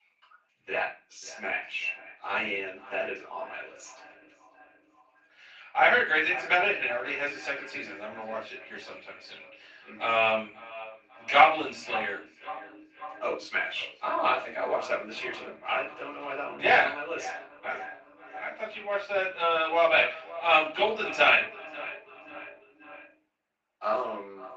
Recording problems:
off-mic speech; far
echo of what is said; noticeable; throughout; 540 ms later, 15 dB below the speech
thin; somewhat; fading below 500 Hz
room echo; slight; dies away in 0.3 s
garbled, watery; slightly

